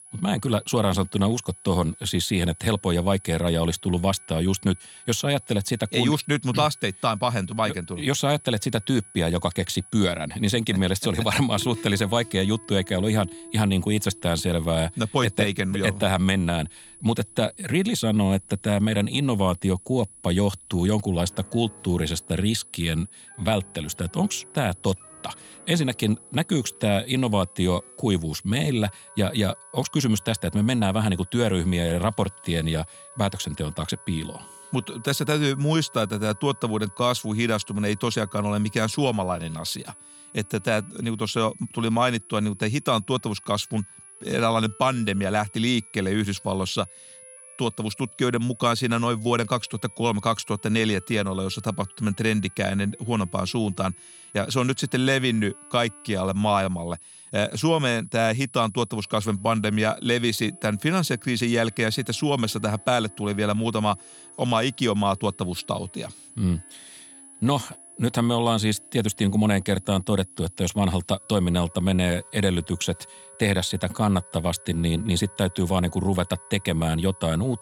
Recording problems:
high-pitched whine; noticeable; throughout; 10 kHz, 20 dB below the speech
background music; faint; throughout; 30 dB below the speech

